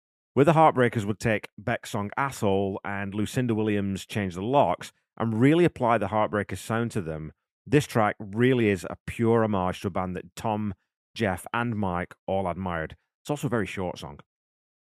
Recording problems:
none

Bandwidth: 14.5 kHz